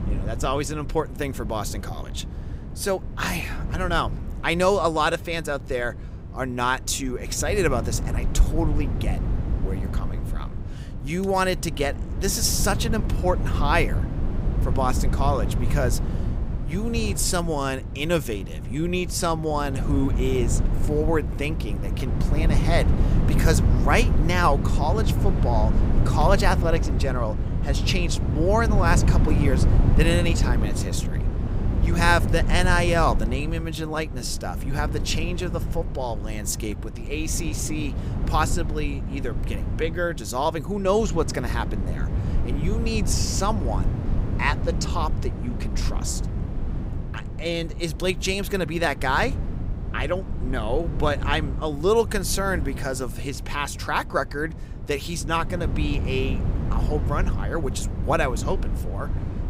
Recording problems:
wind noise on the microphone; occasional gusts; 10 dB below the speech

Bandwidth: 15.5 kHz